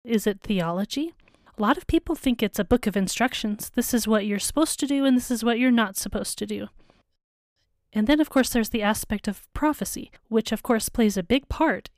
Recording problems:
none

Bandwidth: 15 kHz